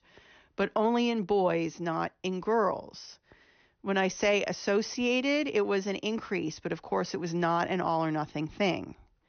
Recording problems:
high frequencies cut off; noticeable; nothing above 6 kHz

